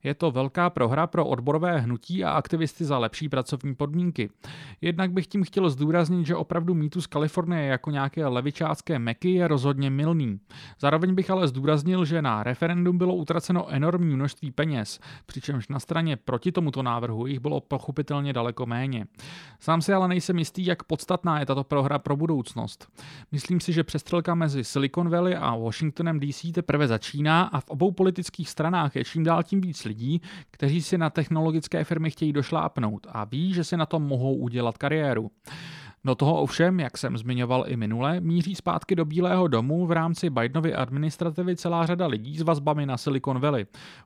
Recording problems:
none

